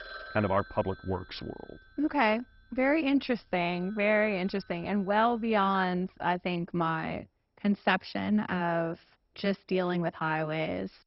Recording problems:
garbled, watery; badly; nothing above 5.5 kHz
alarms or sirens; faint; until 6 s; 20 dB below the speech

